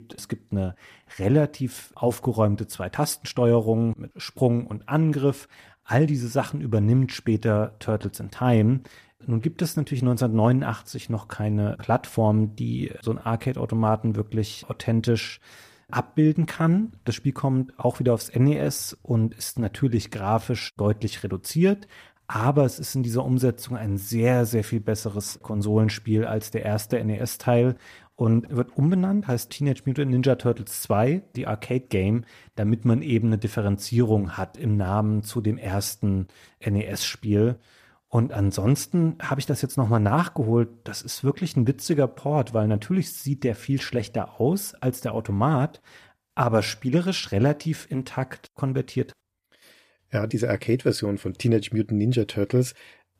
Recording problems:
none

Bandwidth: 14.5 kHz